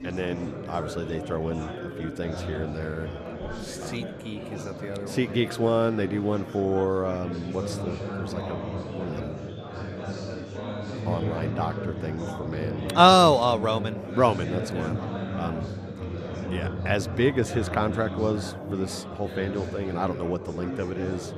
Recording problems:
chatter from many people; loud; throughout; 8 dB below the speech

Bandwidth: 14 kHz